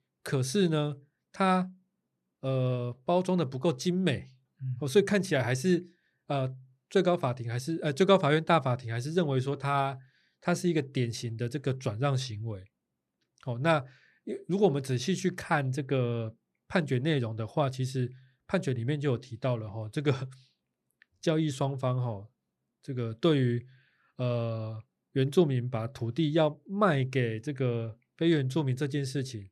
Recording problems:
none

